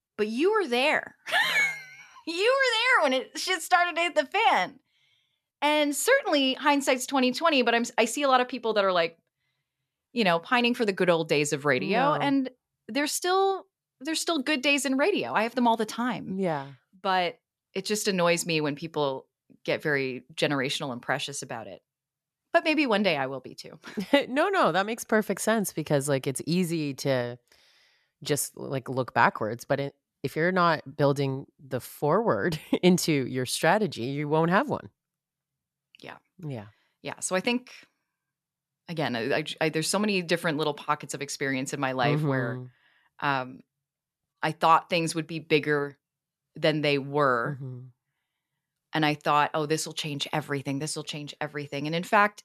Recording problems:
none

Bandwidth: 13.5 kHz